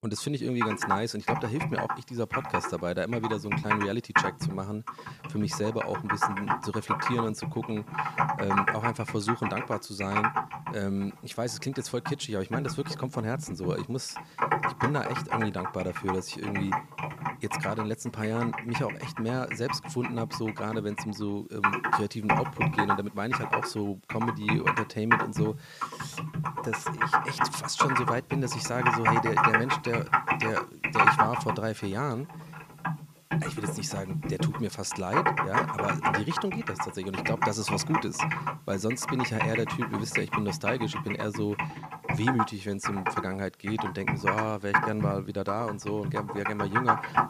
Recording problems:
household noises; very loud; throughout; 3 dB above the speech

